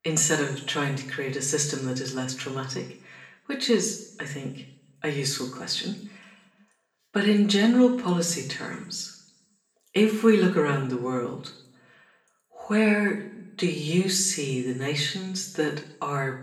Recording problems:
off-mic speech; far
room echo; slight; dies away in 0.6 s

